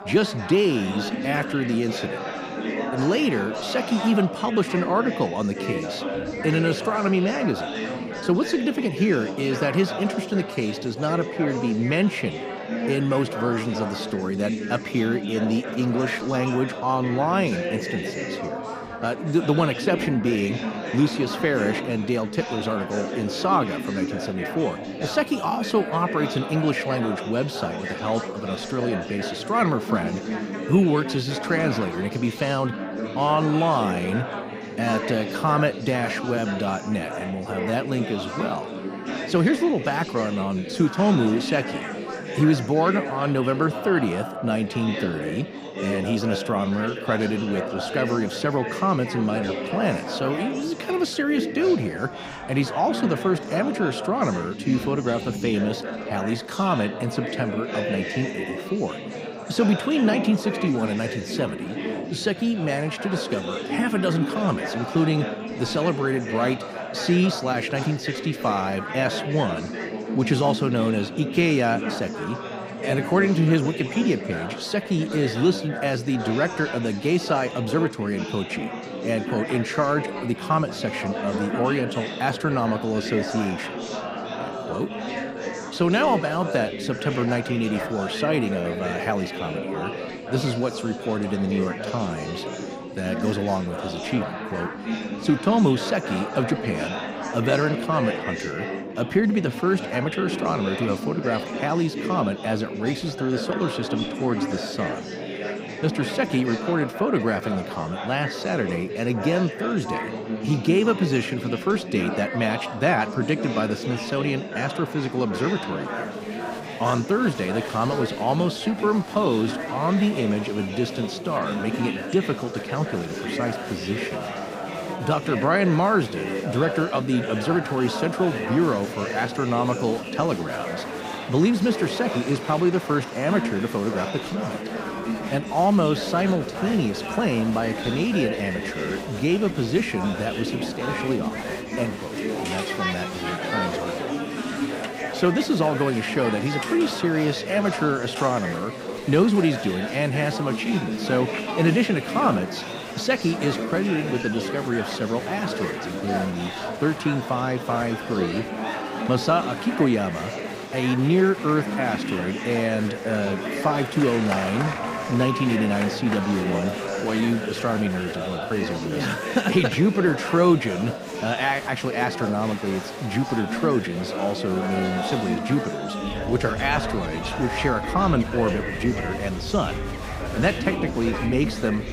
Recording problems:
chatter from many people; loud; throughout; 6 dB below the speech
animal sounds; noticeable; throughout; 15 dB below the speech

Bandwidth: 15.5 kHz